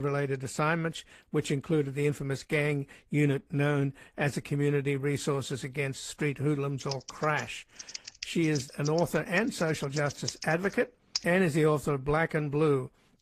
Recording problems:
garbled, watery; slightly; nothing above 14.5 kHz
abrupt cut into speech; at the start
keyboard typing; noticeable; from 7 to 11 s; peak 4 dB below the speech

